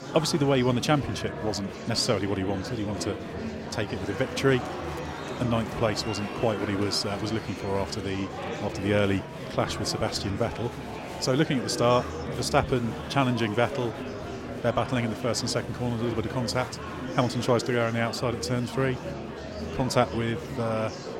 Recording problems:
murmuring crowd; loud; throughout; 7 dB below the speech

